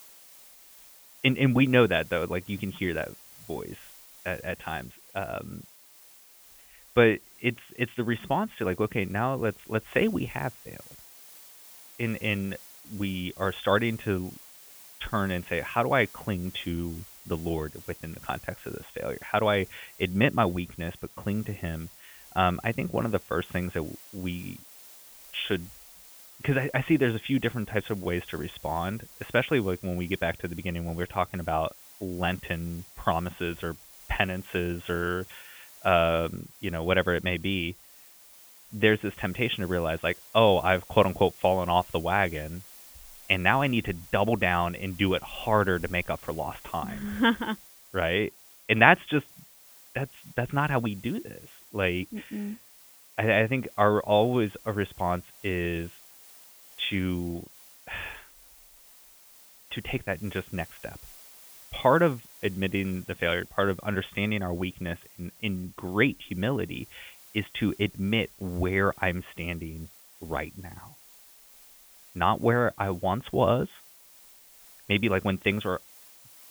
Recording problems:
high frequencies cut off; severe; nothing above 3.5 kHz
hiss; faint; throughout; 20 dB below the speech

